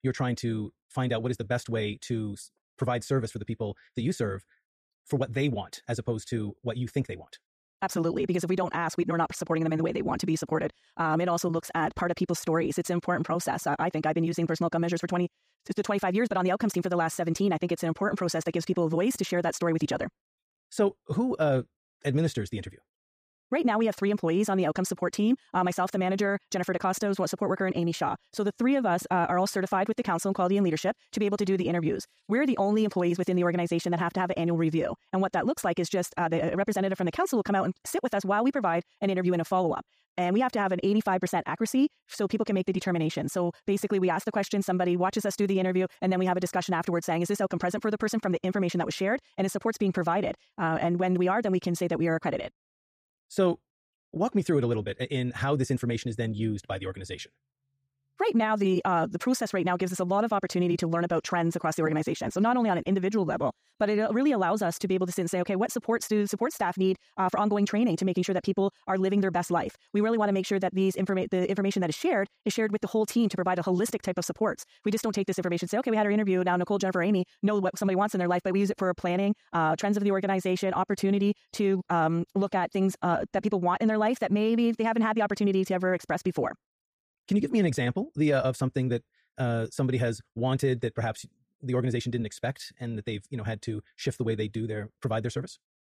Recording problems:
wrong speed, natural pitch; too fast; 1.6 times normal speed

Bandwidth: 15 kHz